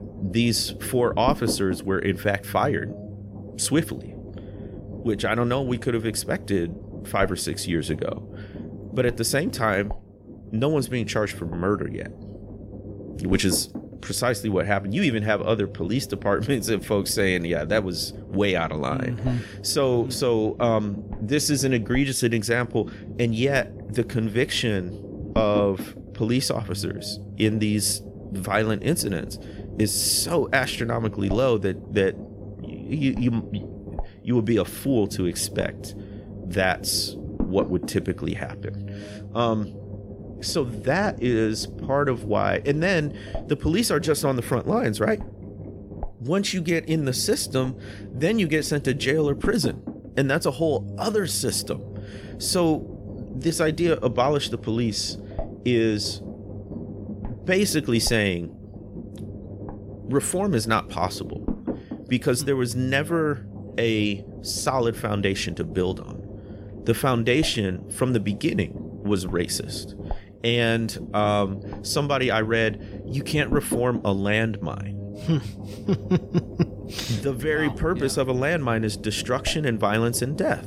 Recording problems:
low rumble; noticeable; throughout; 15 dB below the speech

